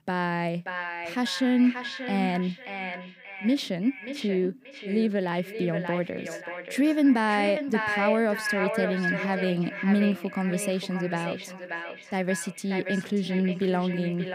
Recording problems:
echo of what is said; strong; throughout; 580 ms later, 7 dB below the speech

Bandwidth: 15.5 kHz